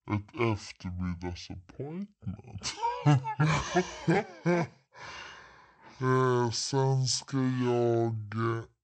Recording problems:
wrong speed and pitch; too slow and too low; 0.5 times normal speed

